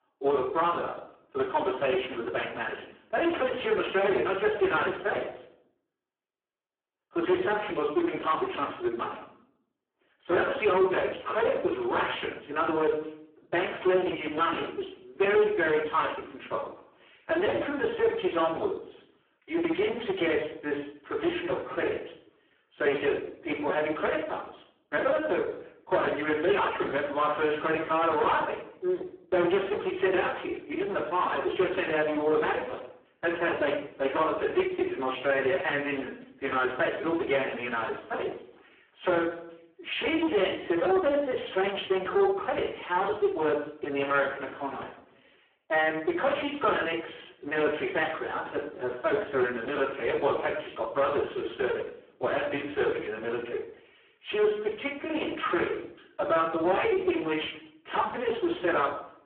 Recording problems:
phone-call audio; poor line
off-mic speech; far
room echo; slight; dies away in 0.5 s
distortion; slight; 9% of the sound clipped

